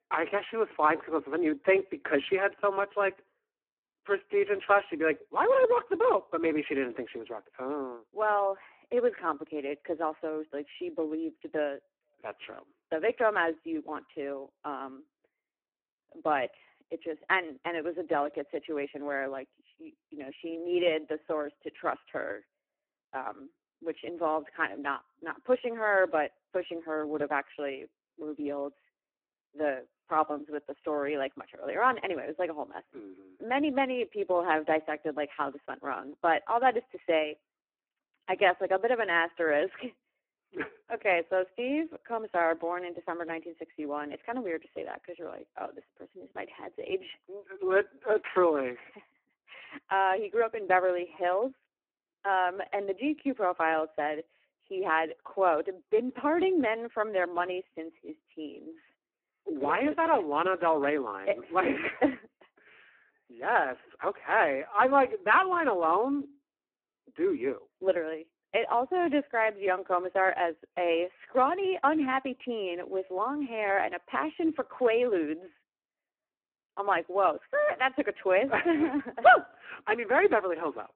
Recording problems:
phone-call audio; poor line

